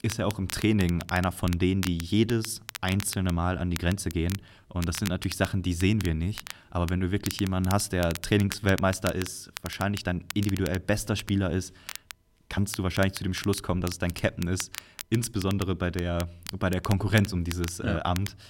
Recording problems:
crackle, like an old record; noticeable; 15 dB below the speech
uneven, jittery; slightly; from 2 to 13 s

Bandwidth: 16 kHz